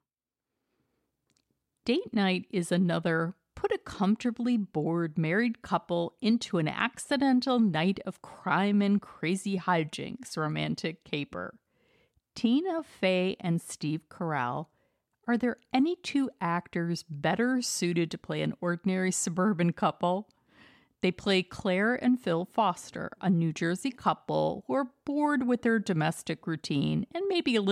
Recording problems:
abrupt cut into speech; at the end

